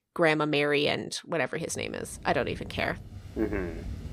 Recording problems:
rain or running water; noticeable; from 2 s on; 15 dB below the speech

